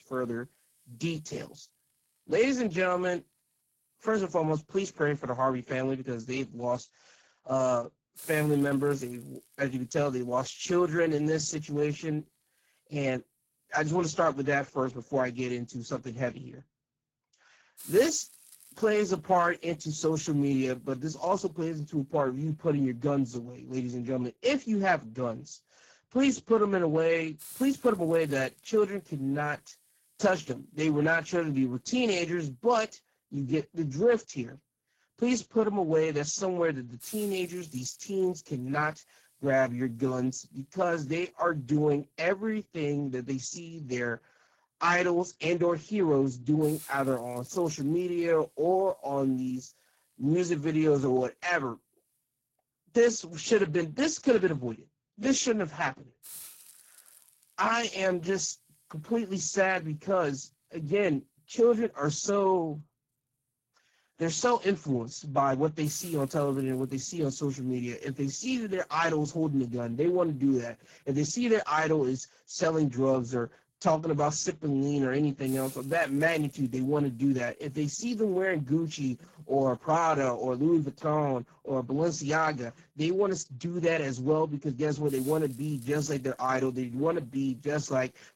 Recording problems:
garbled, watery; badly; nothing above 7 kHz
hiss; faint; throughout; 20 dB below the speech

